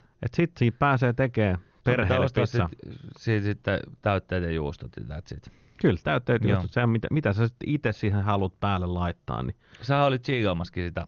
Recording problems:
garbled, watery; slightly

